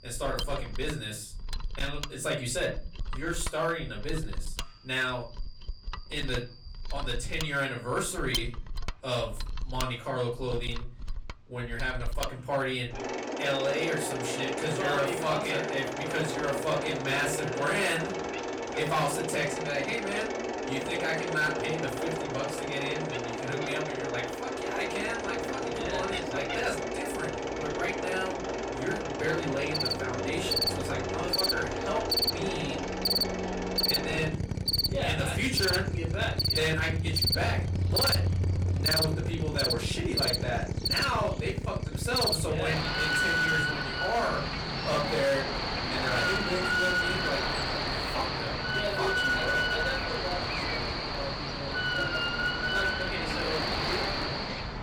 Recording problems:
off-mic speech; far
distortion; slight; 5% of the sound clipped
room echo; very slight; dies away in 0.4 s
animal sounds; very loud; throughout; 2 dB above the speech
machinery noise; loud; throughout; 1 dB below the speech

